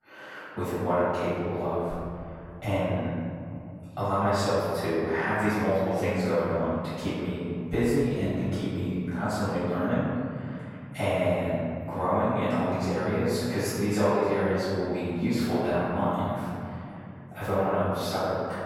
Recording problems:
room echo; strong; dies away in 2.6 s
off-mic speech; far

